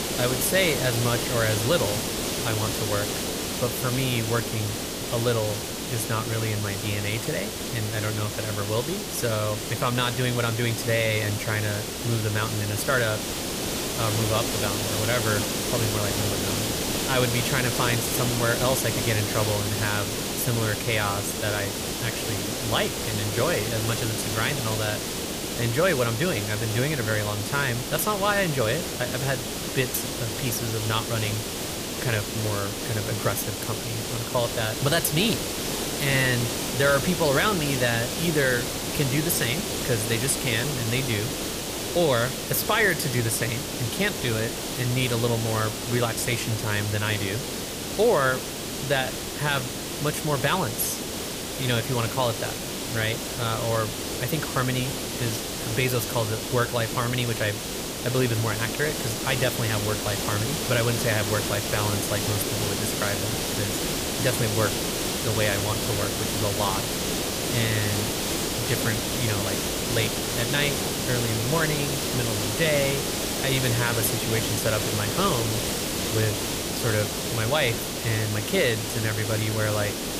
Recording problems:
hiss; loud; throughout; 1 dB below the speech

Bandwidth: 15 kHz